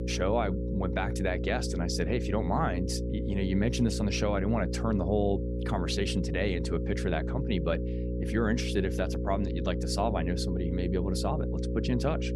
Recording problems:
electrical hum; loud; throughout; 60 Hz, 6 dB below the speech

